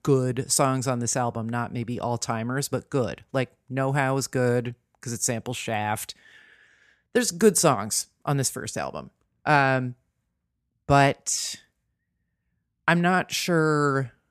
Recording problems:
none

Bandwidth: 14 kHz